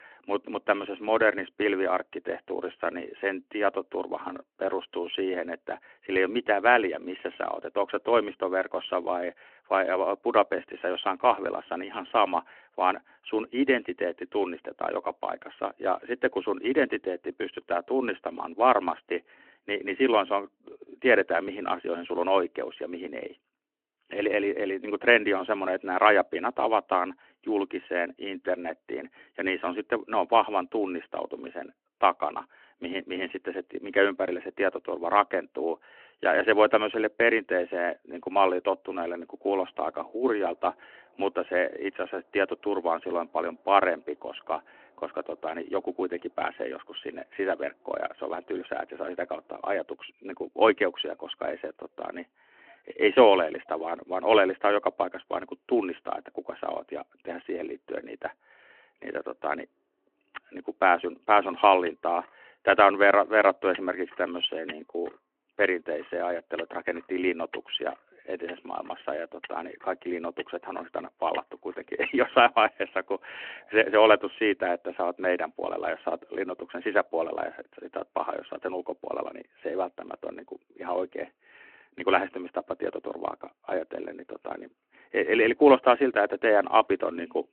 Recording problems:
phone-call audio
traffic noise; faint; from 39 s on; 20 dB below the speech

